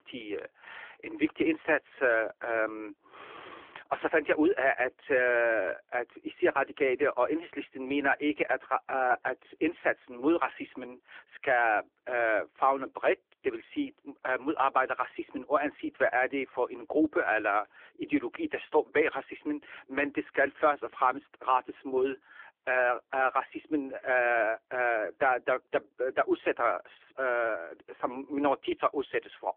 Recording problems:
phone-call audio

